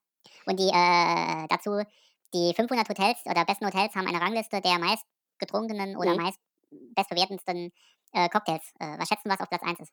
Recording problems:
wrong speed and pitch; too fast and too high; 1.5 times normal speed

